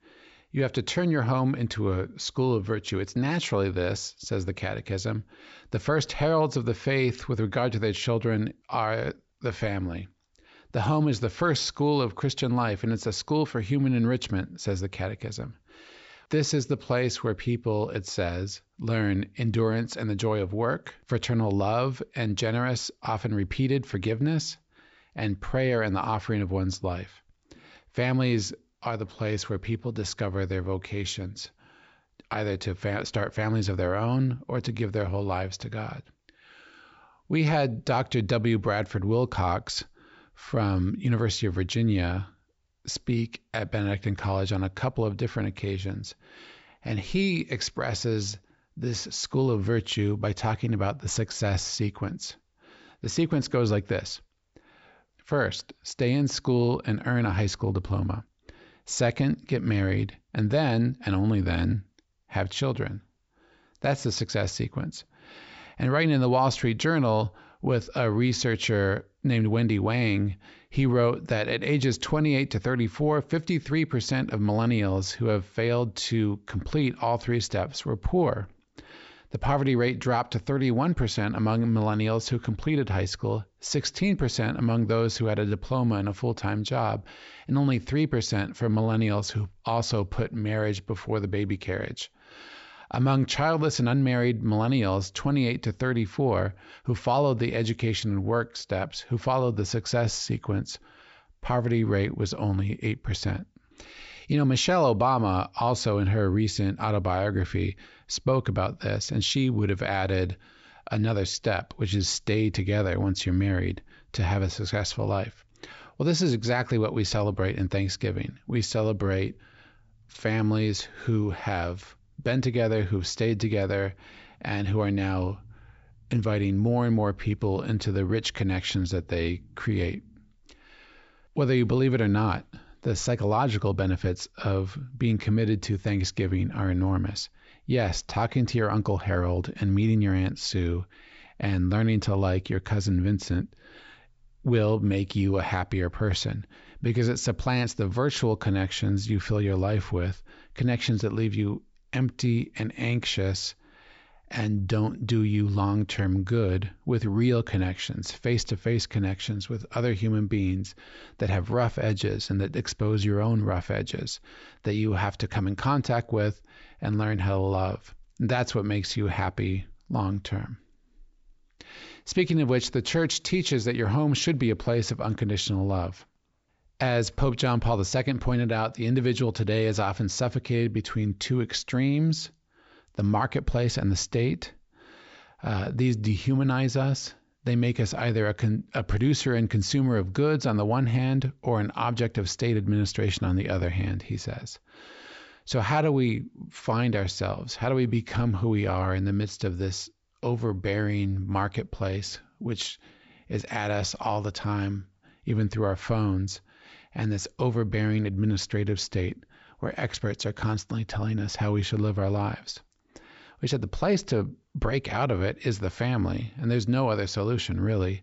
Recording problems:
high frequencies cut off; noticeable; nothing above 8 kHz

